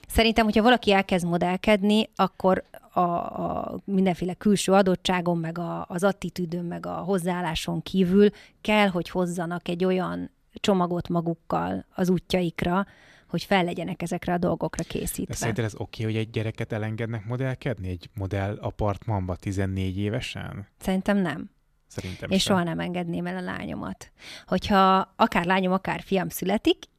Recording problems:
none

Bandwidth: 14.5 kHz